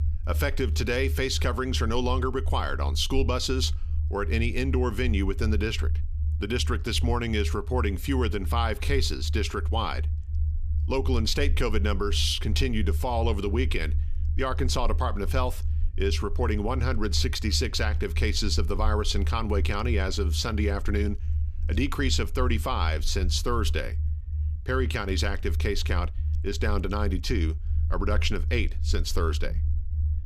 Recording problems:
low rumble; noticeable; throughout; 20 dB below the speech

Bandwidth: 14.5 kHz